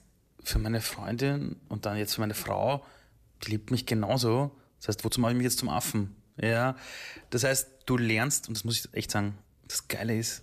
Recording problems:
uneven, jittery; strongly; from 0.5 to 10 s

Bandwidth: 14.5 kHz